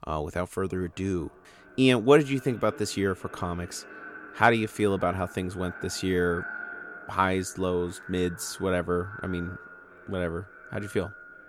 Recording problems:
echo of what is said; noticeable; throughout; 570 ms later, 15 dB below the speech

